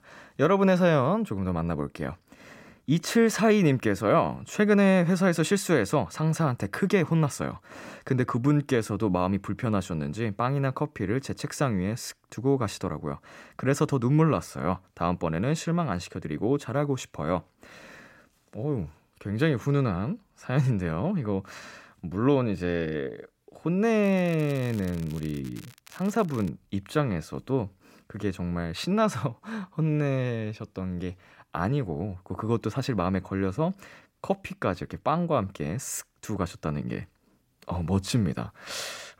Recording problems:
crackling; faint; from 24 to 26 s; 25 dB below the speech

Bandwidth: 16 kHz